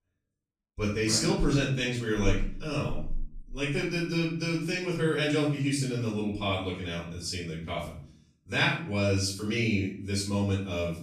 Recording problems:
off-mic speech; far
room echo; noticeable; dies away in 0.5 s

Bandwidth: 14.5 kHz